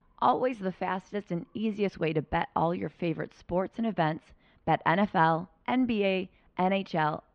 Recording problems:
muffled; very; fading above 3 kHz

